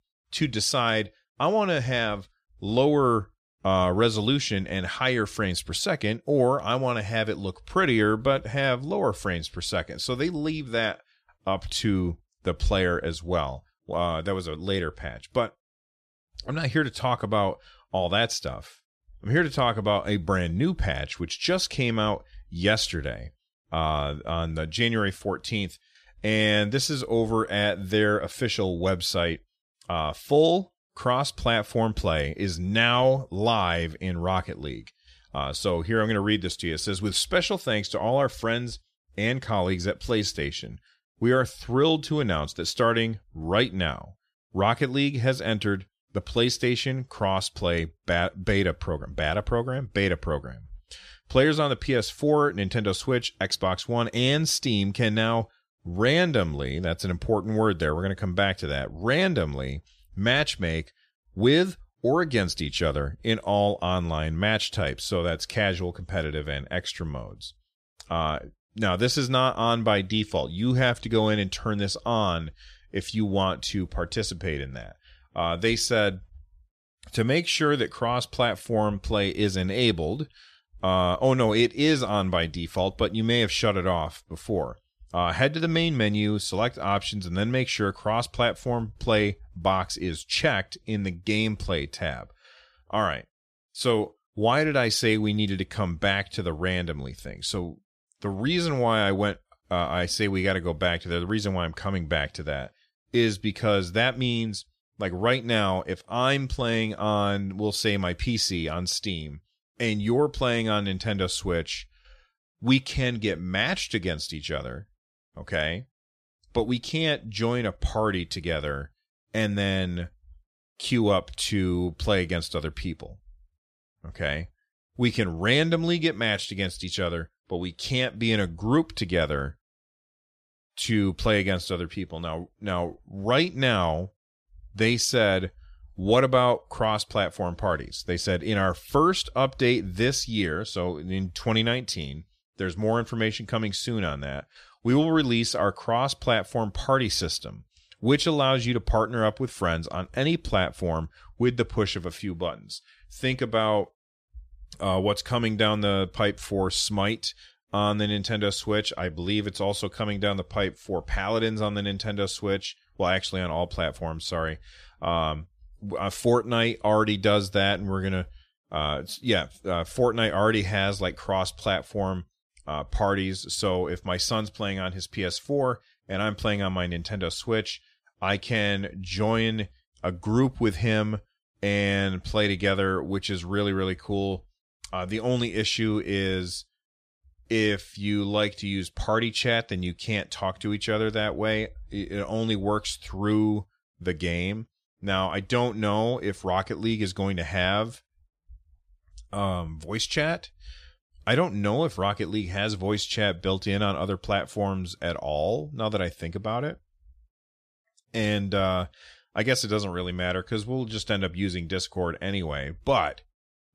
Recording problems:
none

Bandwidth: 14.5 kHz